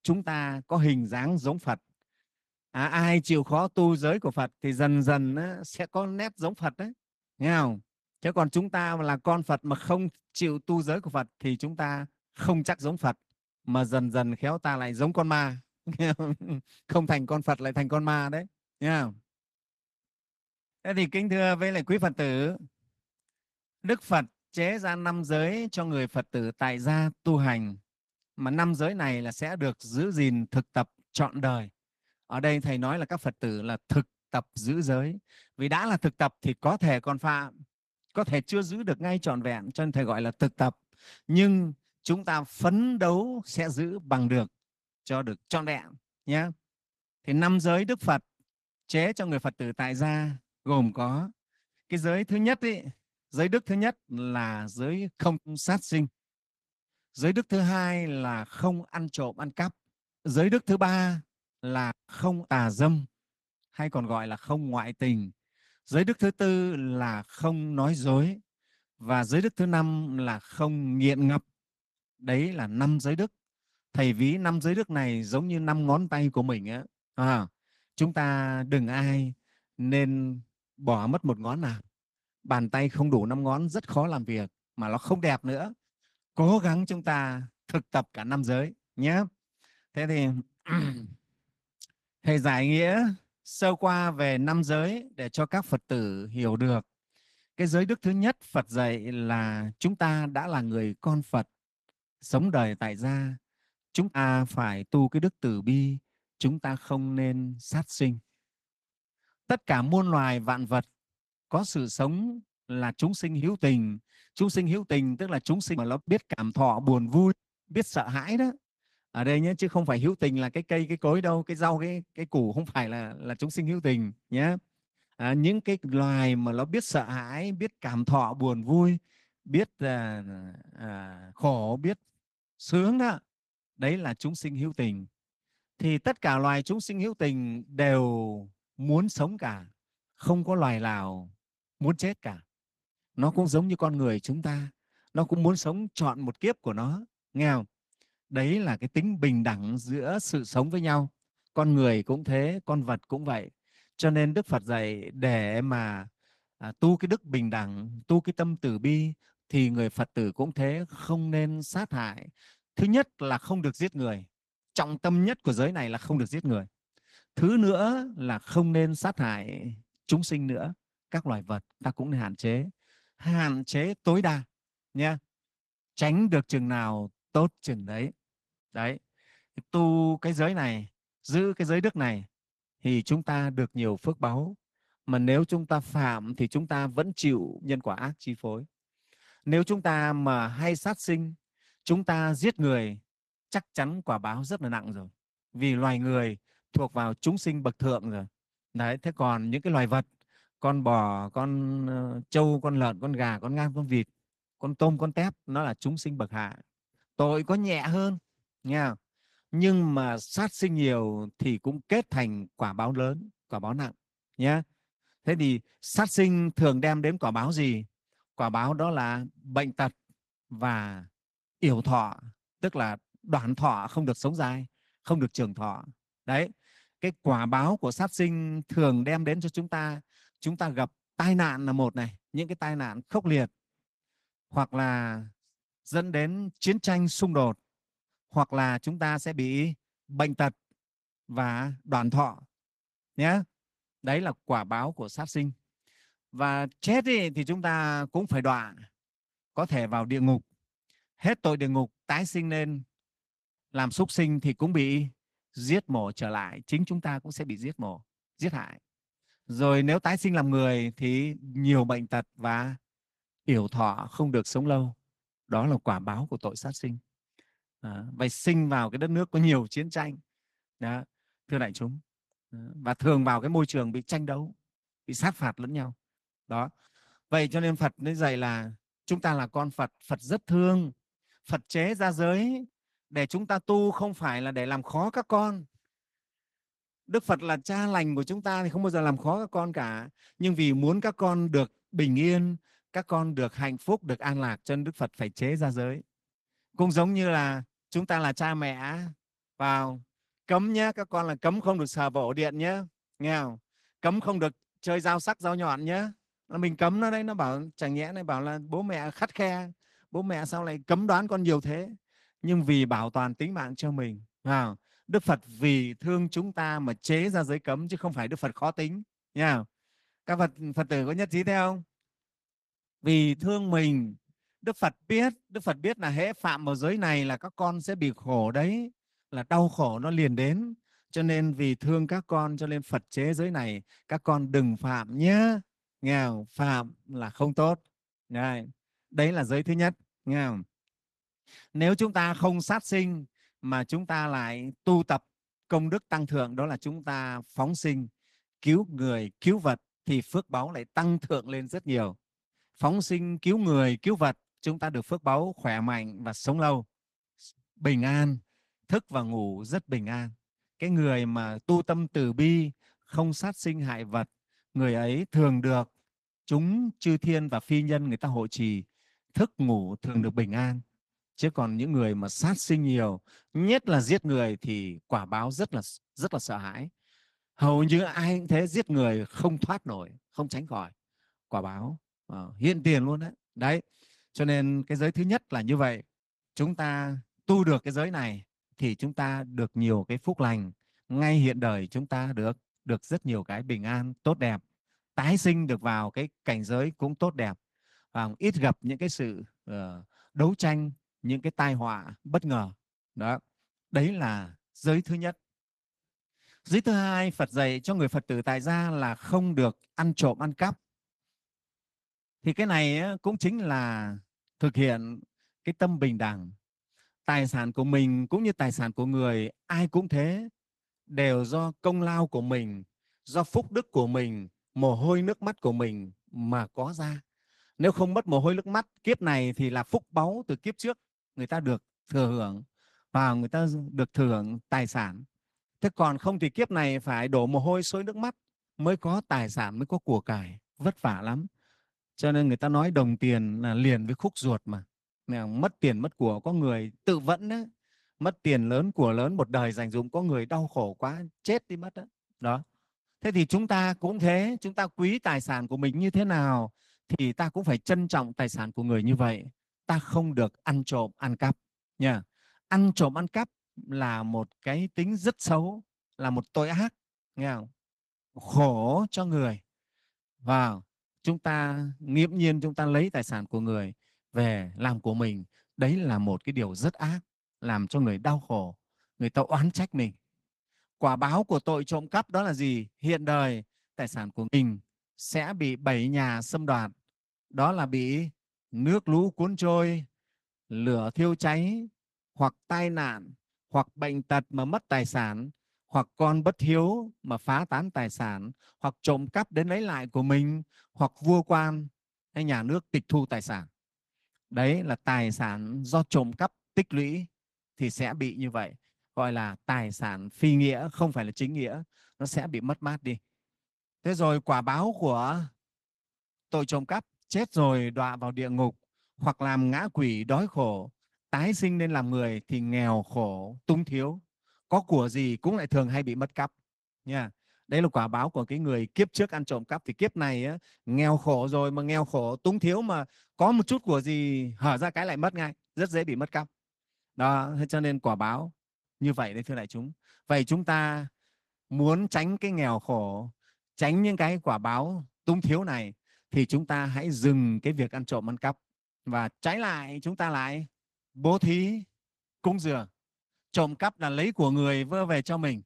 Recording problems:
garbled, watery; slightly; nothing above 13.5 kHz

